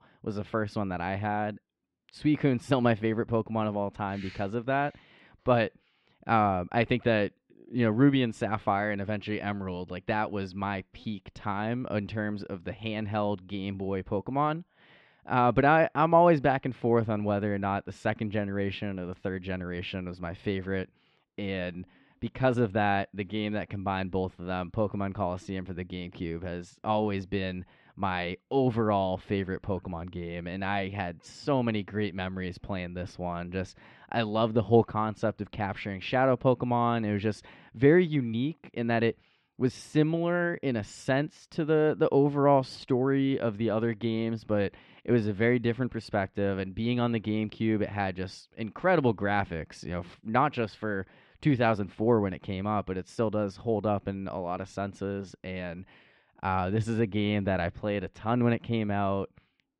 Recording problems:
muffled; slightly; fading above 3.5 kHz

